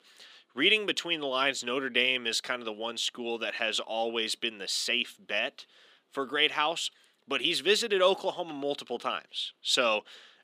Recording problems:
thin; very slightly; fading below 250 Hz

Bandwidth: 15 kHz